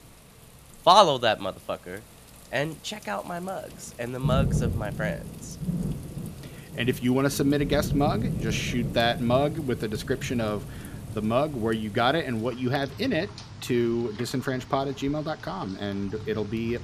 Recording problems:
rain or running water; loud; throughout; 8 dB below the speech

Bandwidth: 14.5 kHz